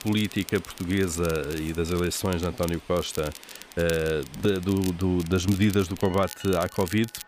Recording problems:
crackle, like an old record; noticeable; 15 dB below the speech
train or aircraft noise; faint; throughout; 20 dB below the speech

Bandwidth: 15 kHz